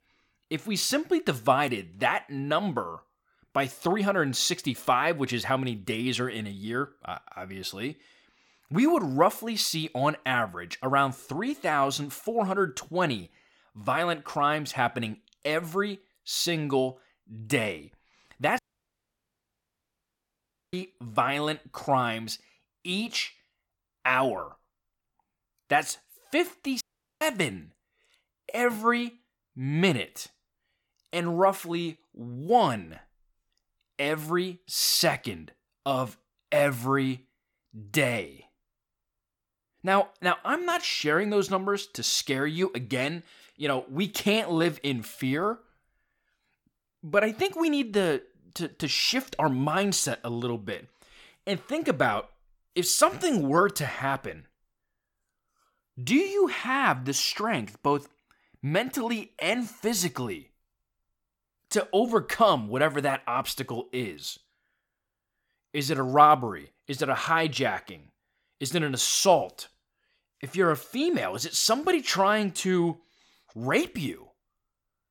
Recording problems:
audio cutting out; at 19 s for 2 s and at 27 s

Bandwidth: 18 kHz